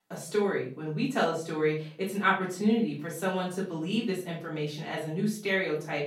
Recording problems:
off-mic speech; far
room echo; slight; dies away in 0.4 s

